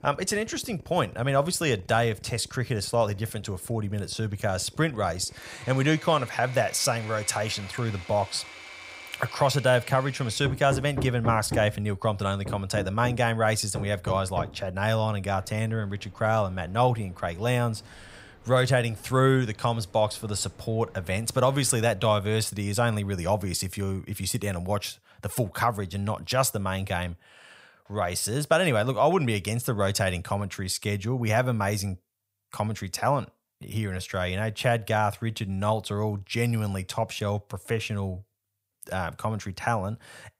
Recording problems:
machinery noise; noticeable; until 22 s; 15 dB below the speech

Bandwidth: 15.5 kHz